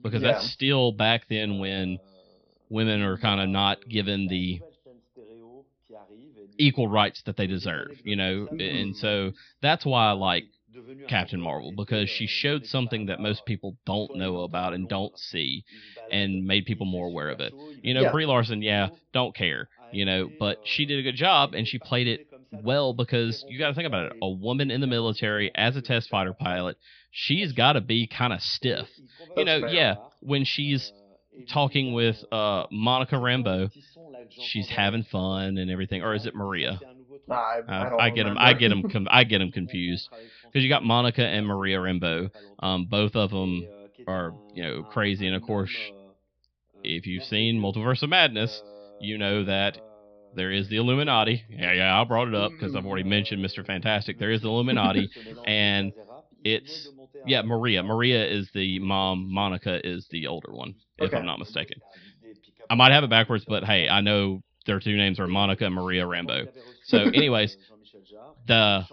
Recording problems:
high frequencies cut off; noticeable; nothing above 5.5 kHz
voice in the background; faint; throughout; 25 dB below the speech

